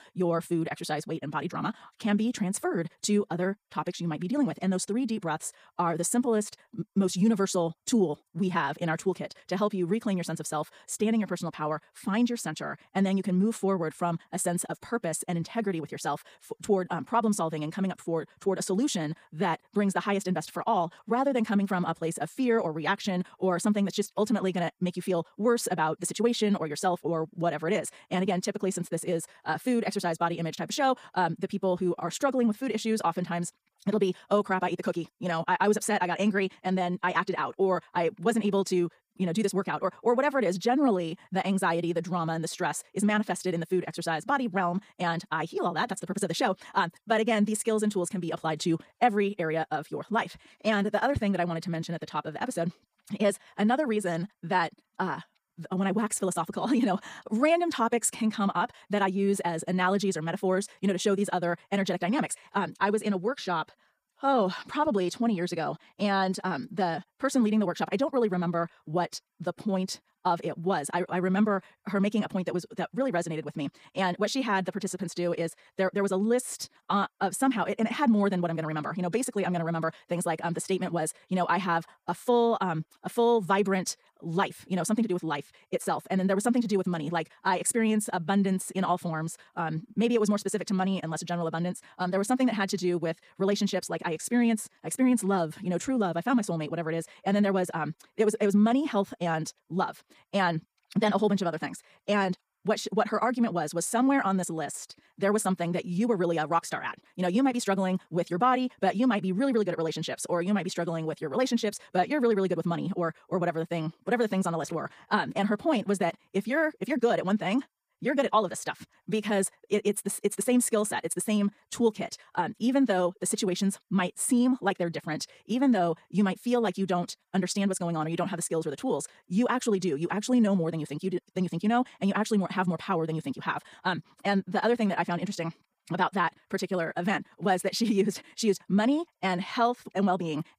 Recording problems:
wrong speed, natural pitch; too fast; 1.7 times normal speed

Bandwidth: 15 kHz